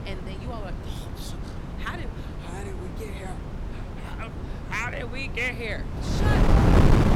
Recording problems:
wind noise on the microphone; heavy; as loud as the speech

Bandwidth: 17 kHz